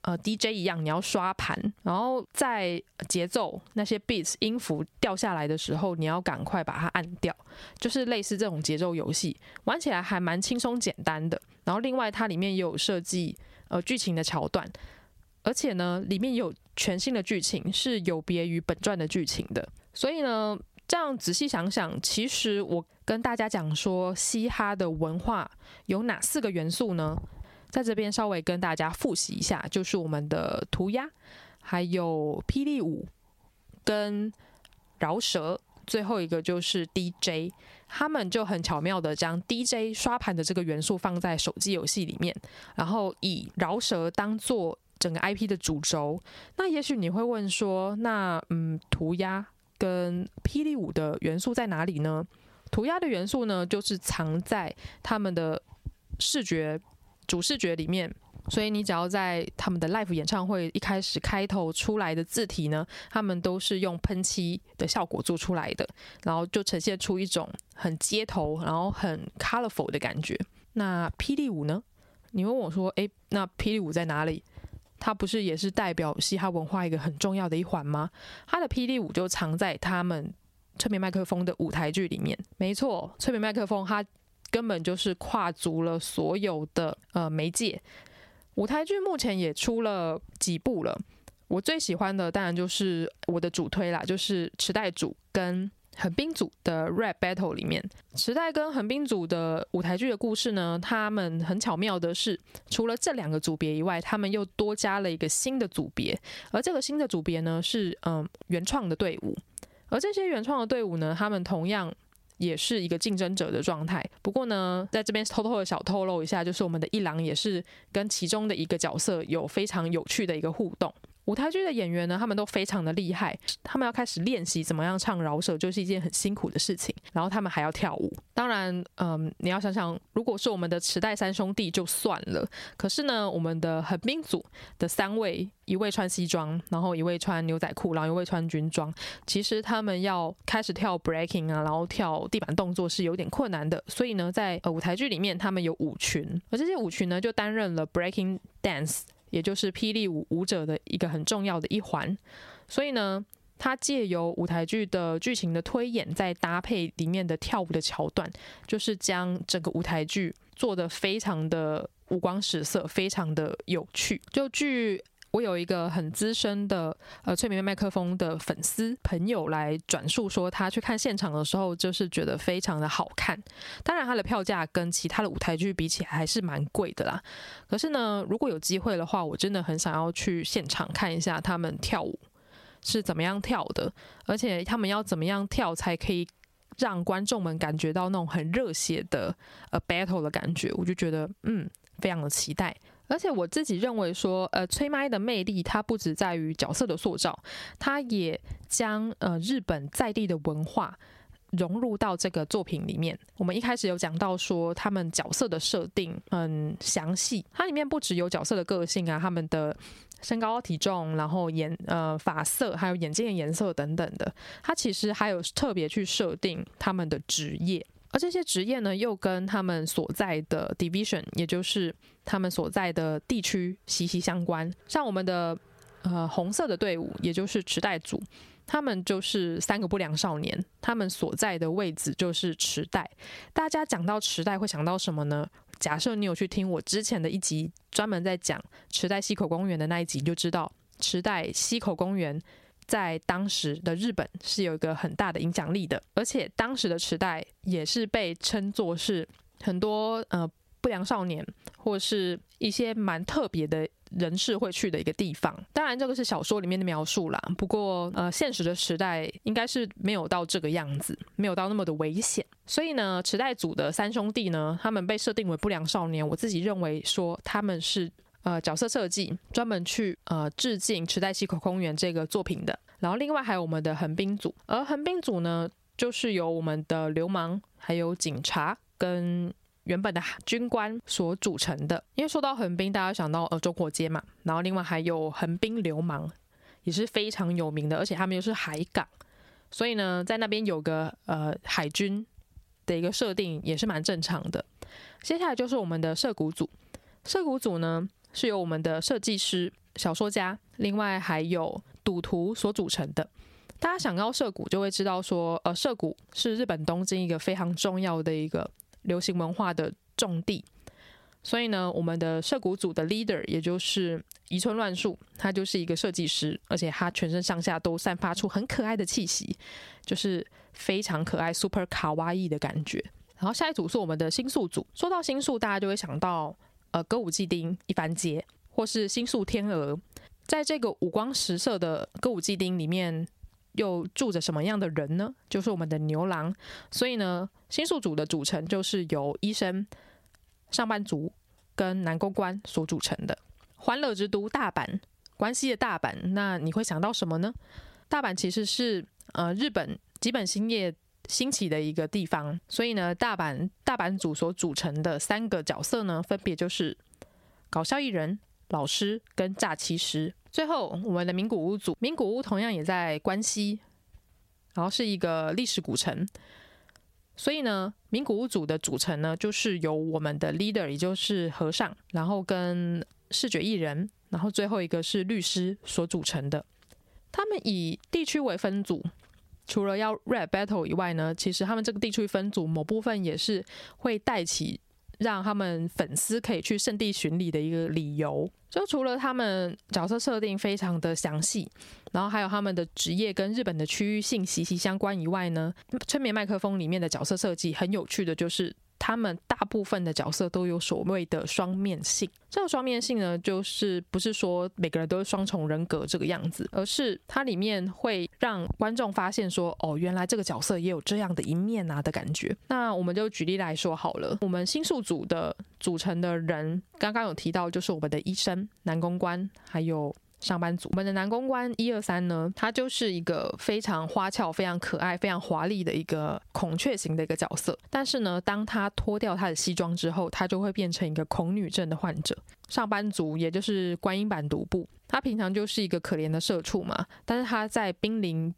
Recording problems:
squashed, flat; somewhat

